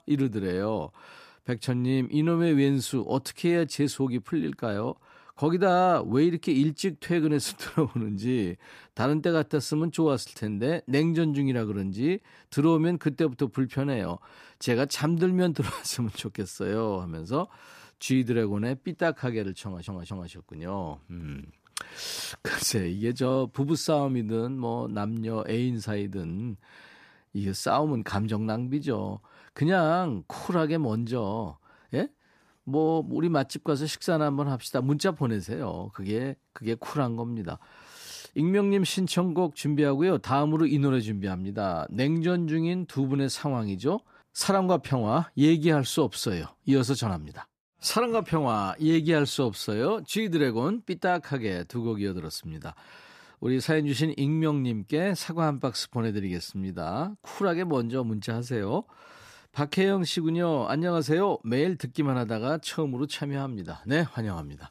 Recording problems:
audio stuttering; at 20 s

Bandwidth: 14.5 kHz